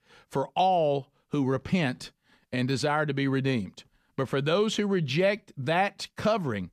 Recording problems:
none

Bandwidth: 14.5 kHz